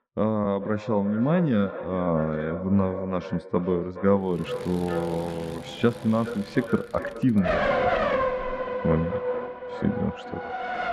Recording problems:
echo of what is said; strong; throughout; 420 ms later, 10 dB below the speech
muffled; very; fading above 2 kHz
traffic noise; loud; from 4.5 s on; 1 dB below the speech

